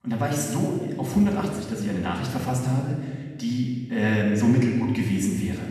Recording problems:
off-mic speech; far
room echo; noticeable; dies away in 1.4 s

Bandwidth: 13.5 kHz